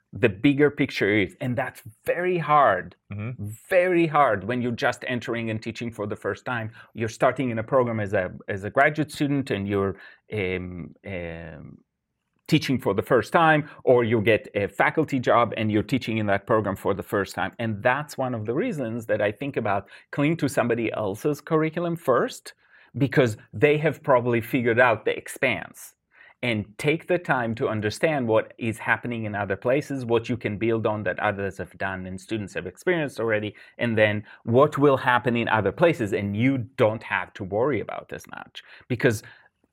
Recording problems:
none

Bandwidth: 16 kHz